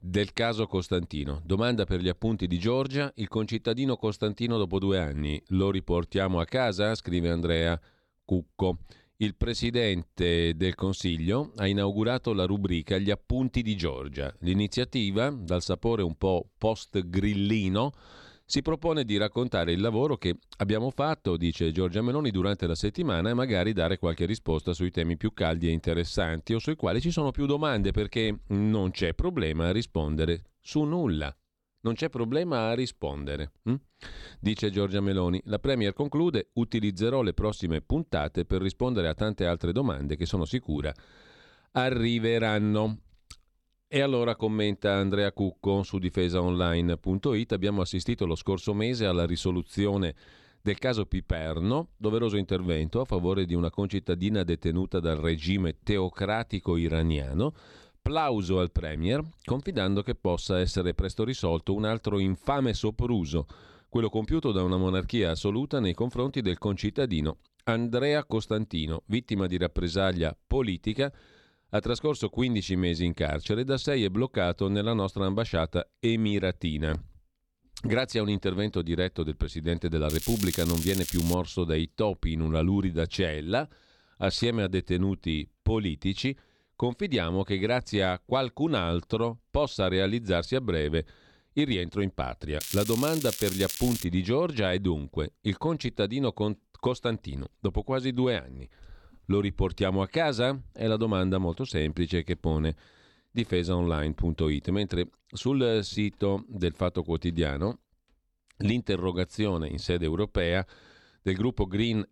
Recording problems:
crackling; loud; from 1:20 to 1:21 and from 1:33 to 1:34; 6 dB below the speech

